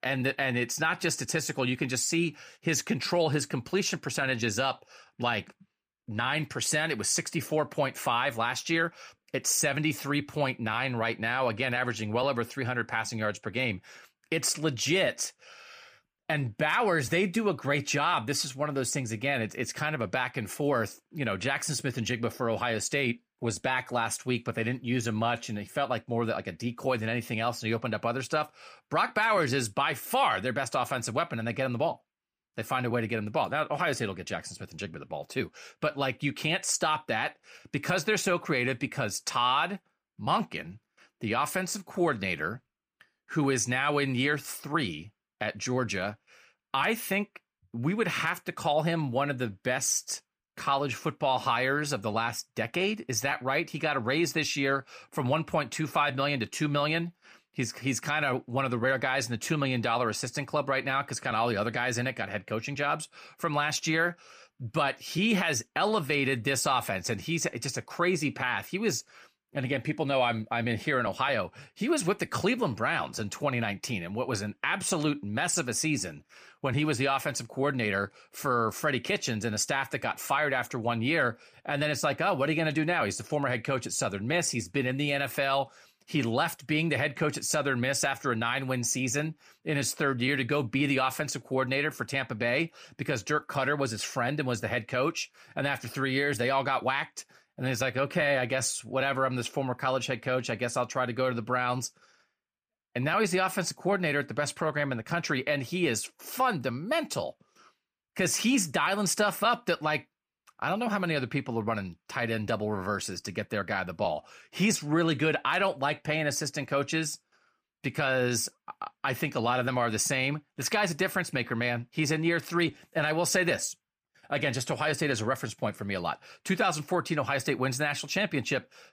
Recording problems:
none

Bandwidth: 15 kHz